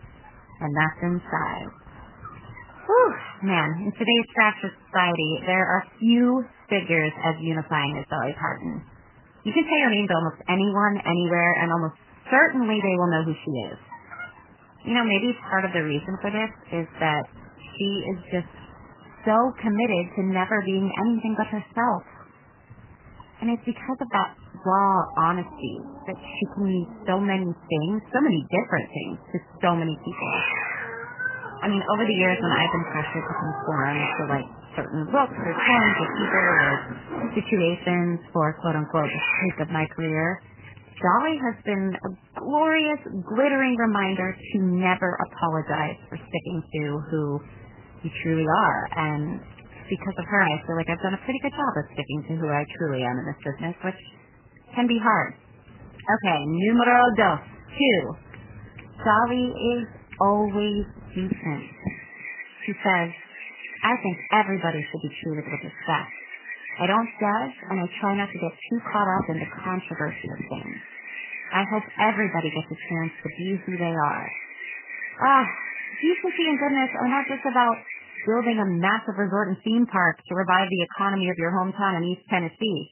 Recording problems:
garbled, watery; badly; nothing above 3 kHz
animal sounds; loud; throughout; 7 dB below the speech

